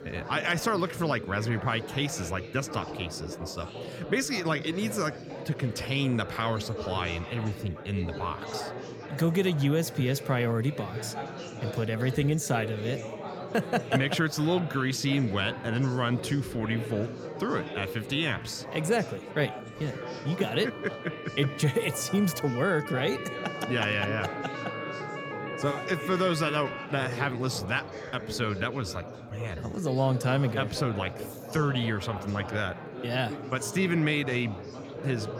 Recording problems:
chatter from many people; loud; throughout; 9 dB below the speech
siren; noticeable; from 19 to 27 s; peak 8 dB below the speech

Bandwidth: 17.5 kHz